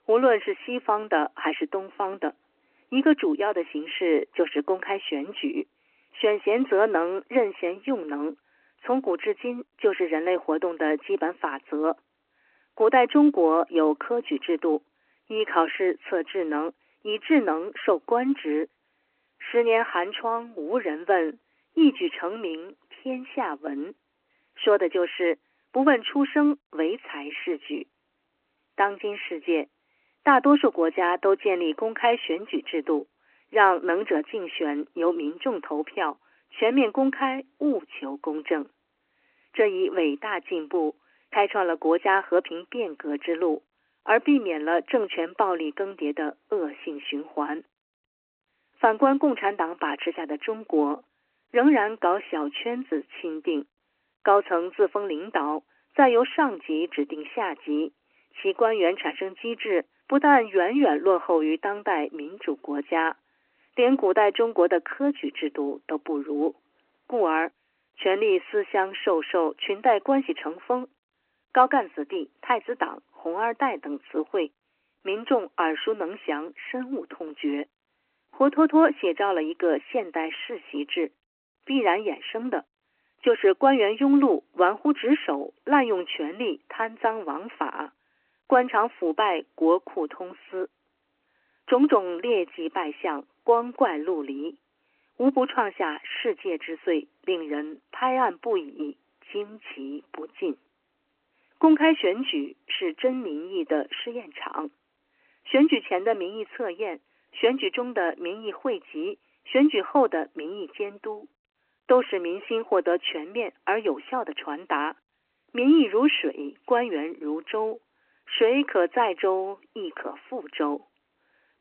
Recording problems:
phone-call audio; nothing above 3 kHz

